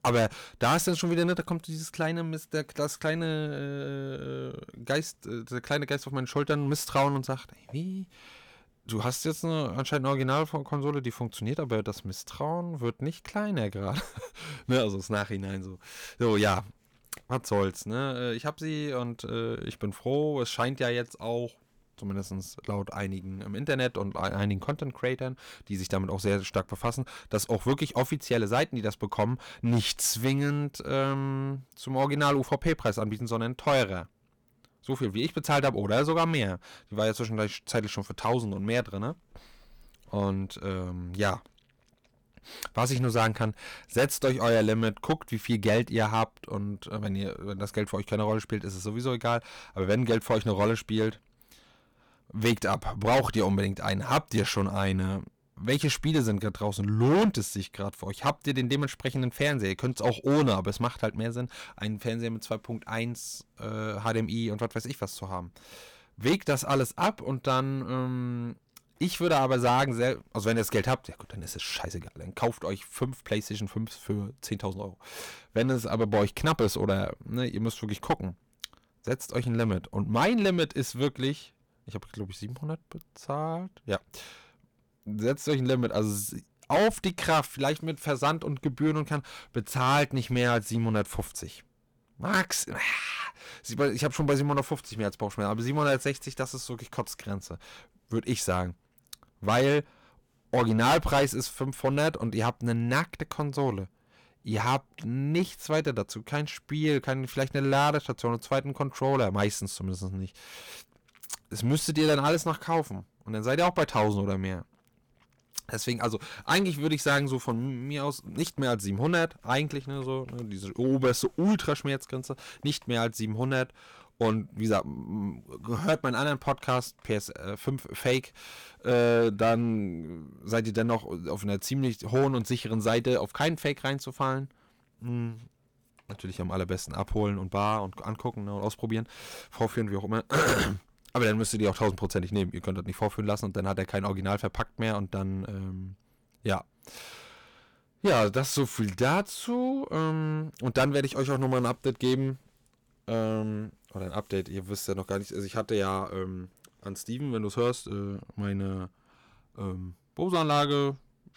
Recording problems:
distortion; heavy; 4% of the sound clipped

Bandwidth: 19 kHz